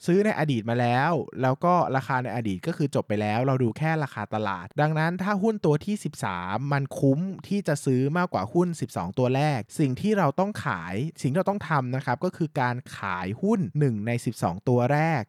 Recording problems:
none

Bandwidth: 18.5 kHz